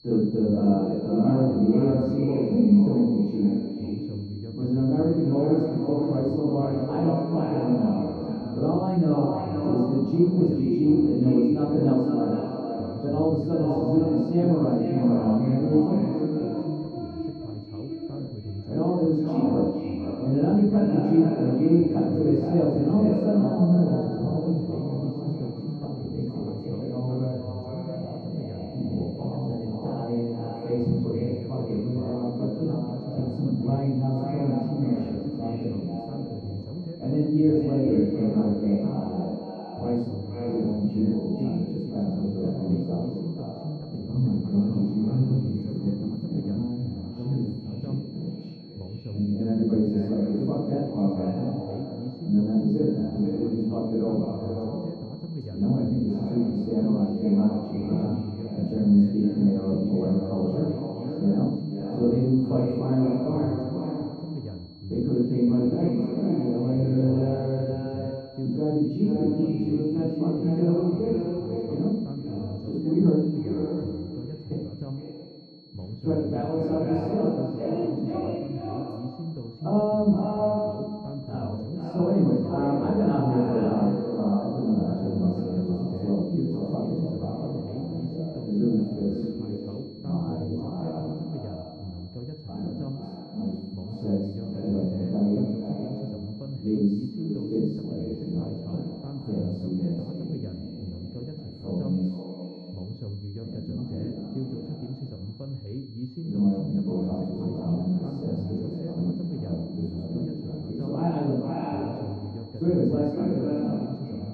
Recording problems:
echo of what is said; strong; throughout; 460 ms later, 7 dB below the speech
off-mic speech; far
muffled; very; fading above 1 kHz
room echo; noticeable; dies away in 0.6 s
voice in the background; noticeable; throughout; 10 dB below the speech
high-pitched whine; faint; throughout; 4.5 kHz, 25 dB below the speech

